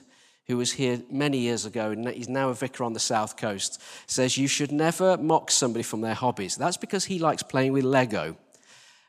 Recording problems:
none

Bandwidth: 14.5 kHz